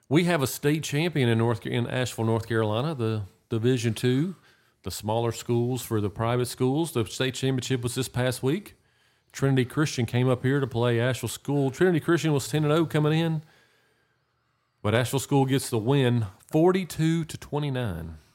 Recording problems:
none

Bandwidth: 16 kHz